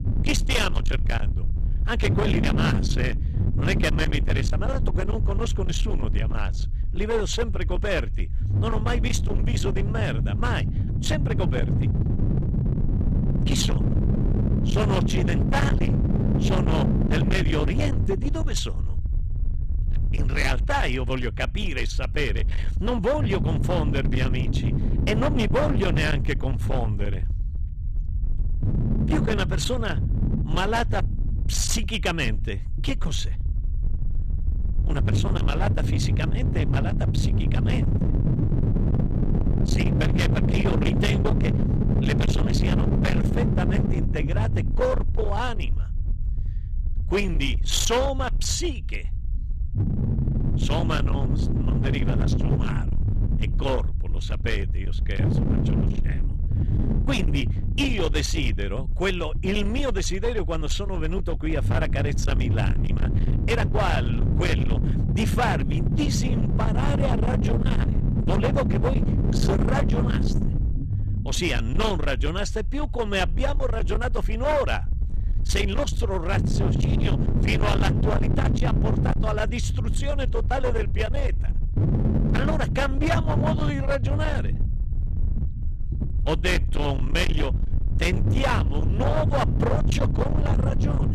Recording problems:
distortion; heavy; 31% of the sound clipped
low rumble; loud; throughout; 6 dB below the speech

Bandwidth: 14 kHz